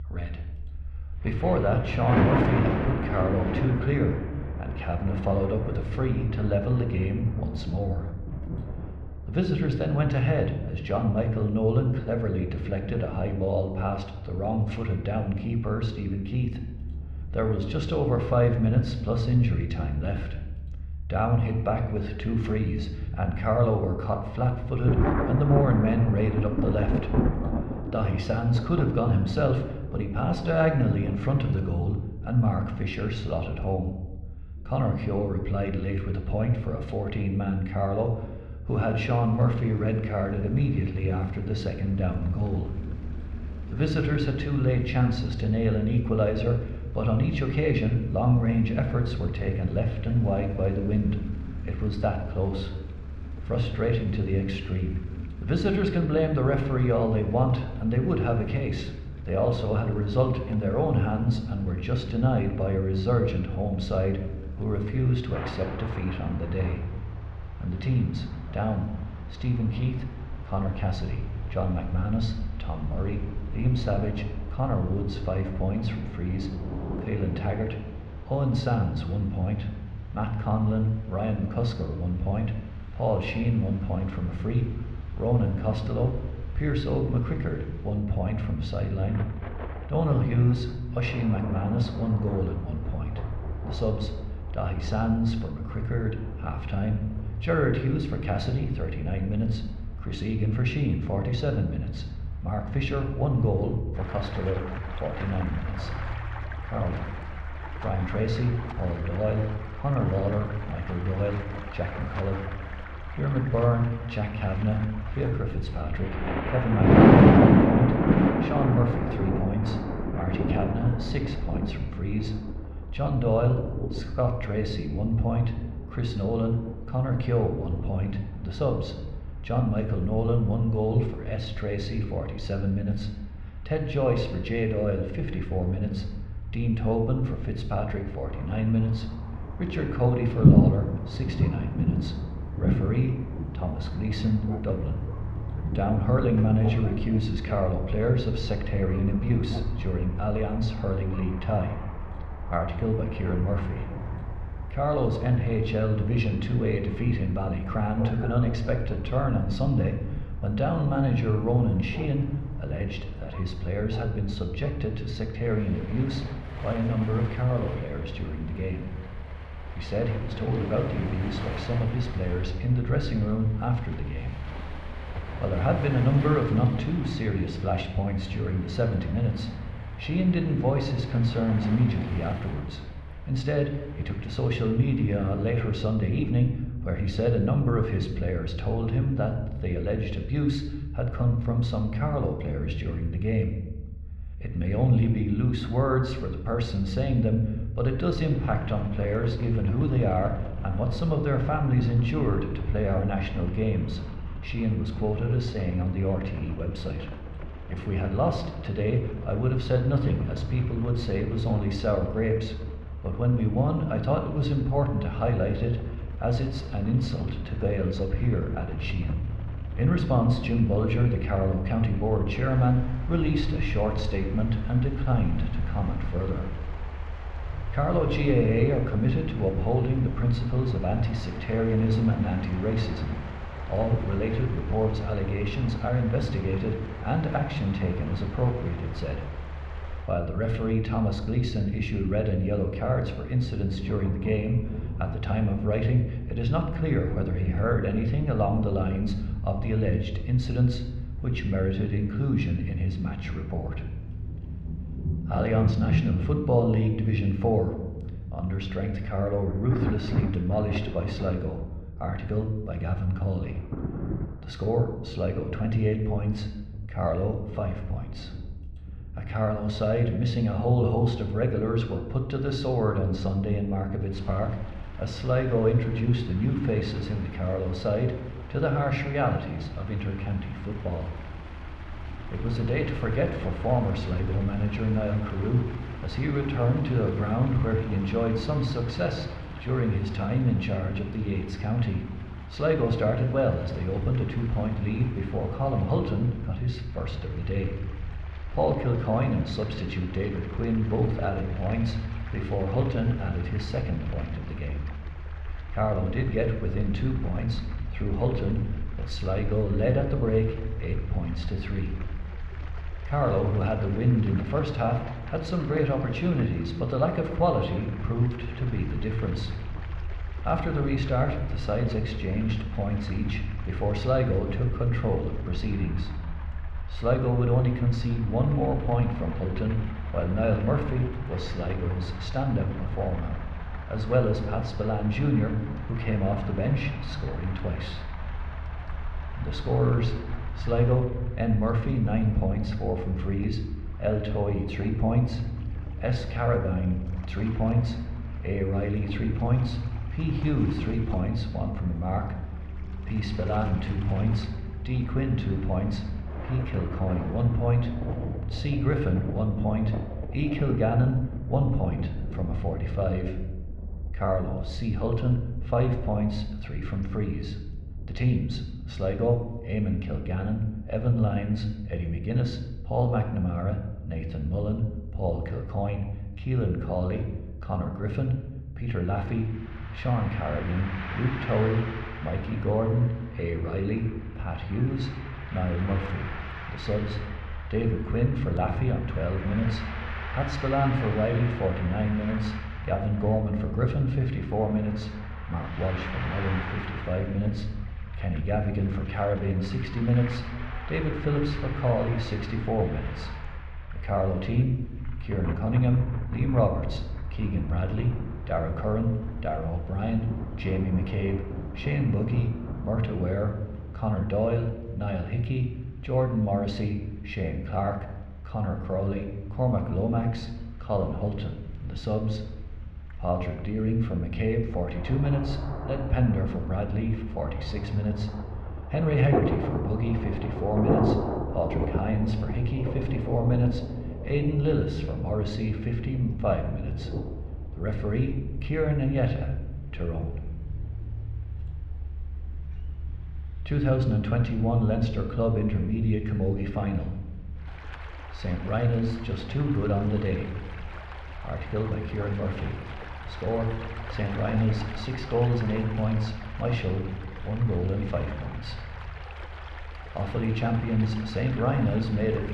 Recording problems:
muffled; slightly; fading above 2.5 kHz
room echo; slight; dies away in 0.8 s
rain or running water; loud; throughout; 7 dB below the speech
low rumble; faint; throughout; 25 dB below the speech

